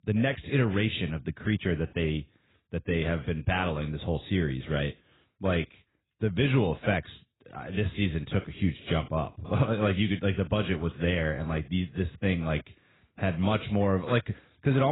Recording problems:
garbled, watery; badly; nothing above 4 kHz
abrupt cut into speech; at the end

